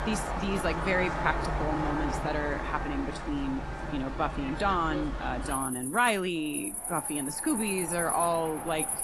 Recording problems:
garbled, watery; slightly; nothing above 11.5 kHz
animal sounds; loud; throughout; 4 dB below the speech
wind noise on the microphone; occasional gusts; 10 dB below the speech

